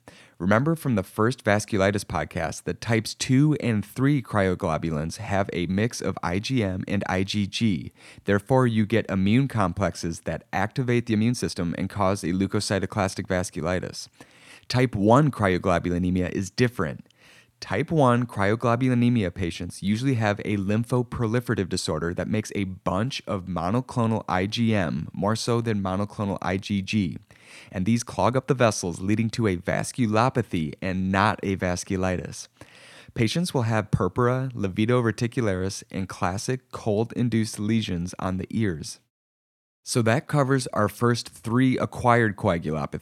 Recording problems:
uneven, jittery; strongly; from 8 to 41 s

